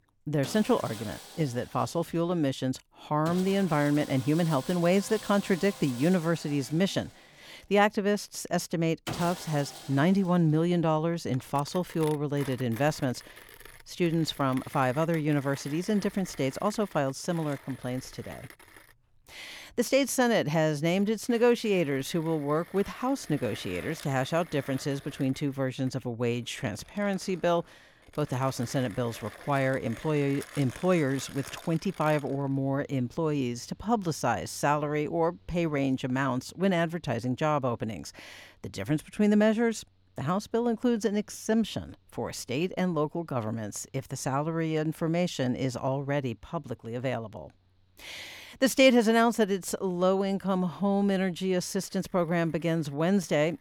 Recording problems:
machinery noise; noticeable; throughout; 15 dB below the speech

